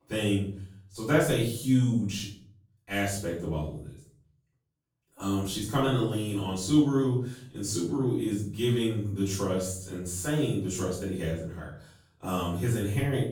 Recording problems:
off-mic speech; far
room echo; noticeable; dies away in 0.5 s

